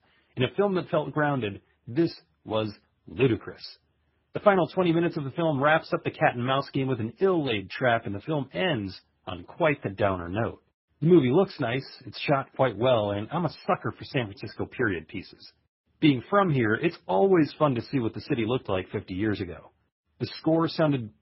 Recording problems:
garbled, watery; badly; nothing above 5.5 kHz

